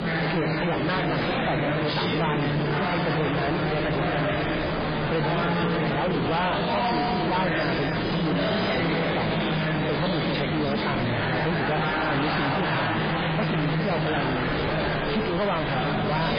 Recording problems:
distortion; heavy; 6 dB below the speech
garbled, watery; badly; nothing above 4 kHz
murmuring crowd; very loud; throughout; 2 dB above the speech
wind noise on the microphone; heavy; 7 dB below the speech

